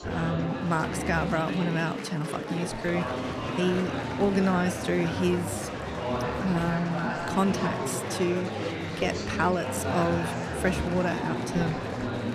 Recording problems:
murmuring crowd; loud; throughout; 2 dB below the speech

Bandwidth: 14 kHz